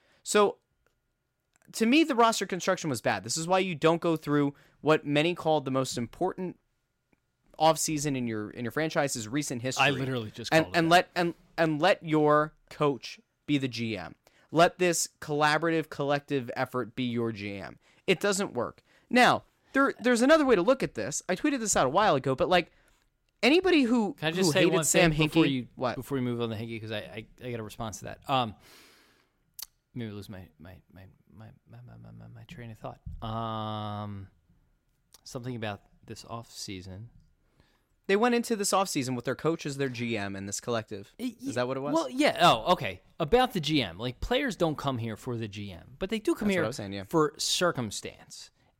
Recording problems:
none

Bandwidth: 16 kHz